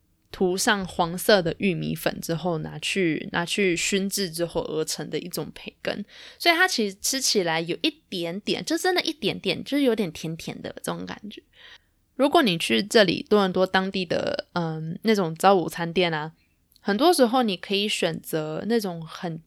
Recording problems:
none

